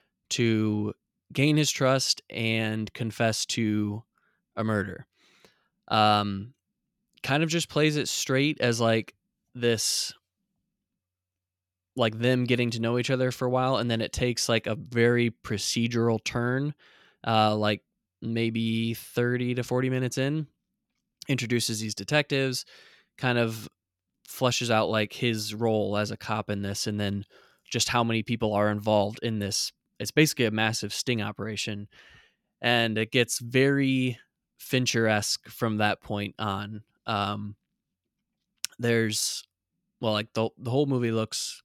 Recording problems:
none

